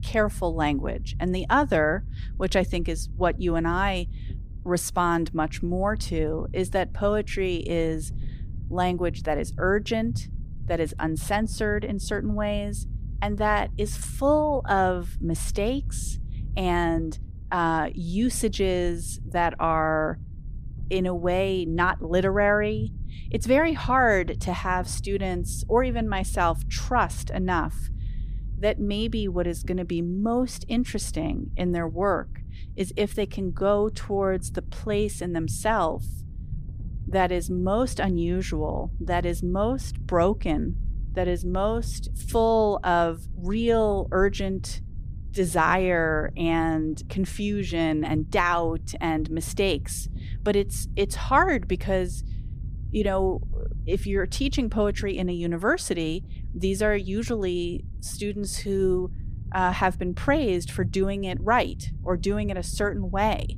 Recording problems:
low rumble; faint; throughout; 25 dB below the speech

